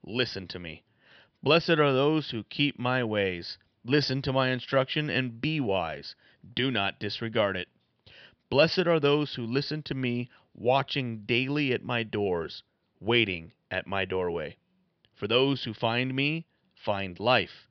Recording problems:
high frequencies cut off; noticeable; nothing above 5.5 kHz

